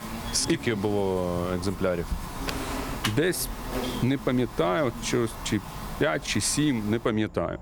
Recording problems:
squashed, flat; somewhat
household noises; loud; until 3 s; 10 dB below the speech
animal sounds; noticeable; throughout; 10 dB below the speech

